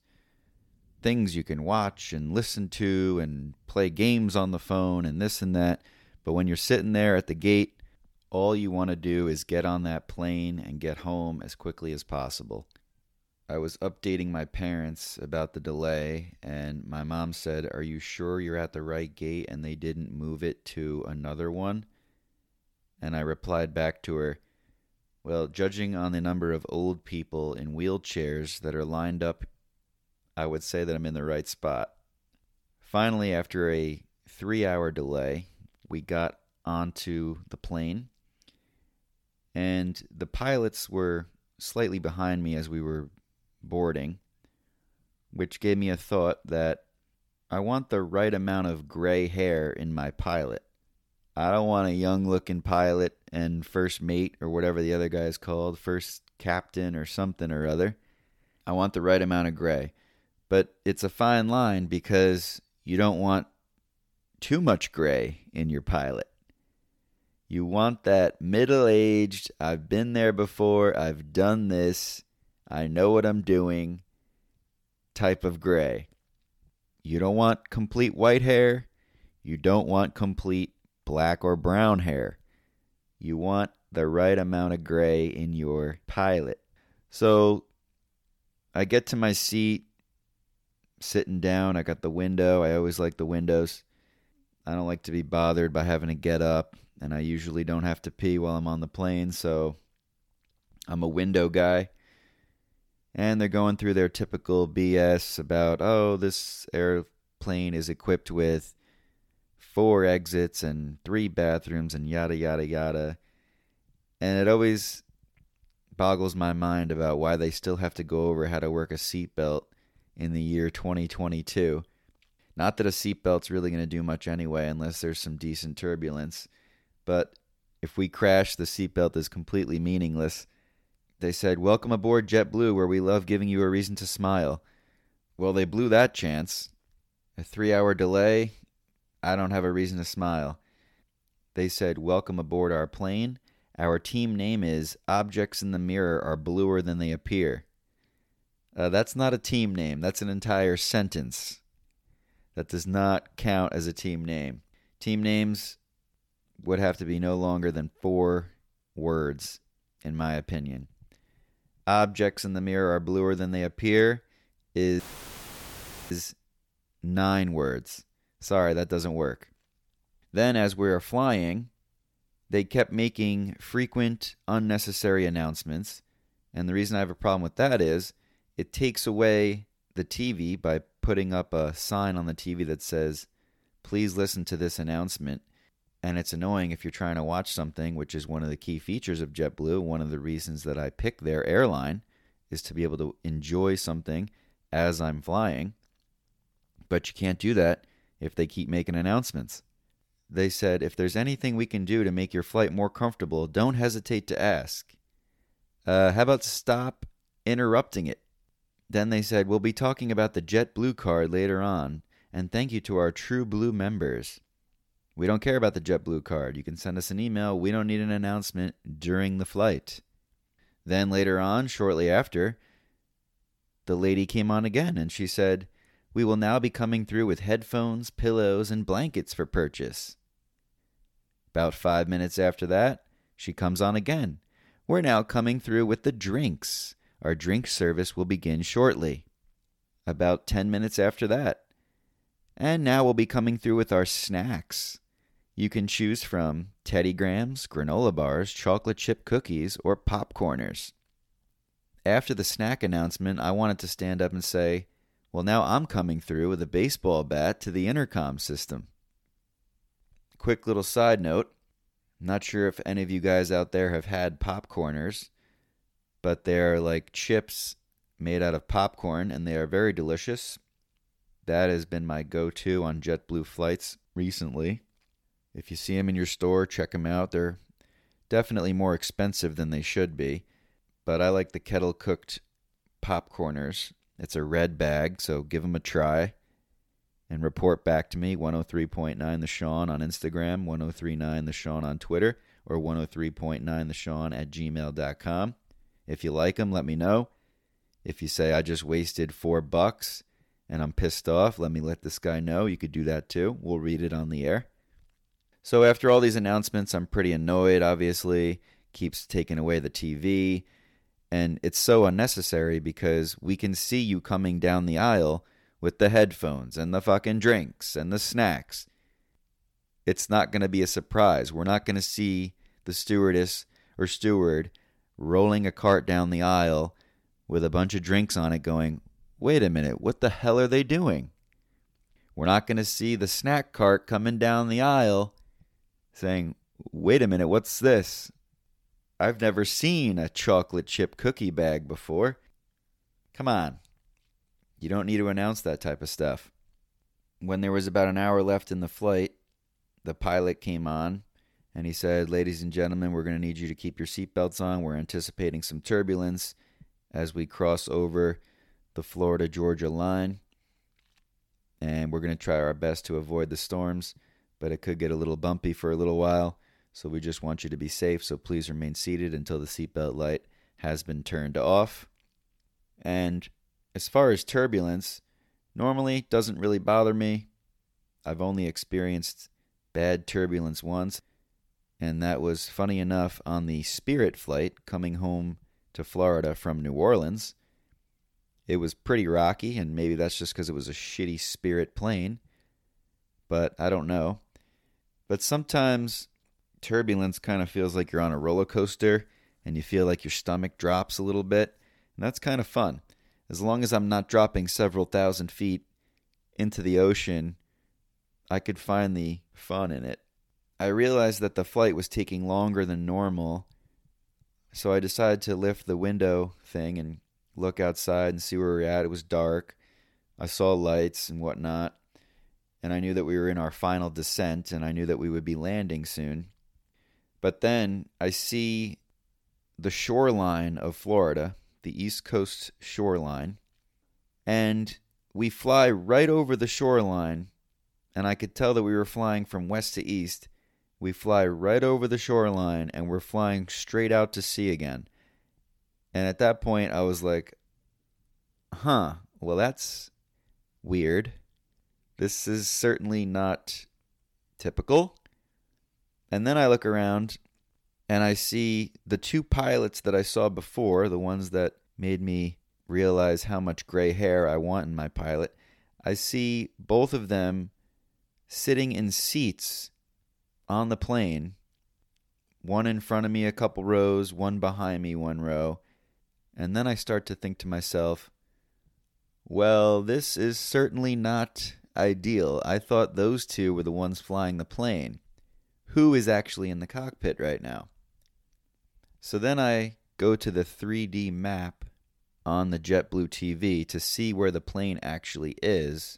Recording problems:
audio cutting out; filled with static; at 2:45 for 1 s

